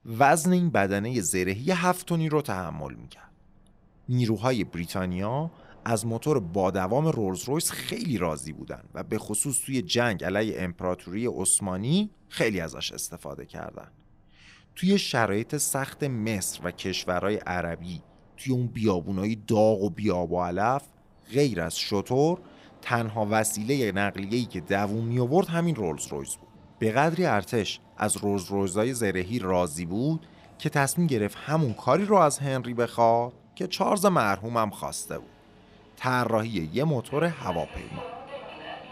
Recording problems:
train or aircraft noise; faint; throughout; 25 dB below the speech

